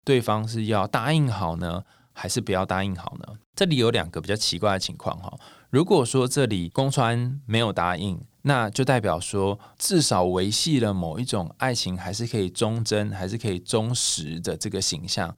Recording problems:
none

